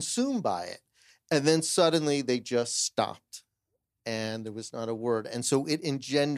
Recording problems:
abrupt cut into speech; at the start and the end

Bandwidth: 14.5 kHz